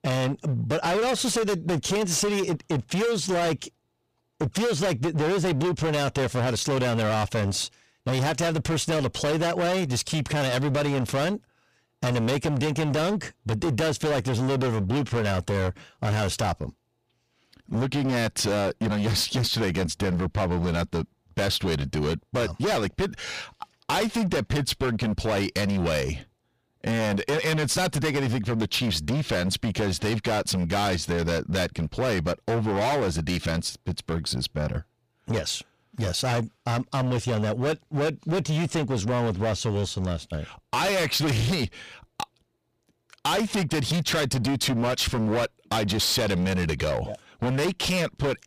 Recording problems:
distortion; heavy; 26% of the sound clipped

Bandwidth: 15 kHz